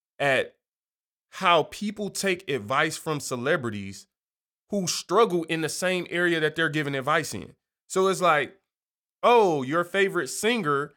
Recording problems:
none

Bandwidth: 17.5 kHz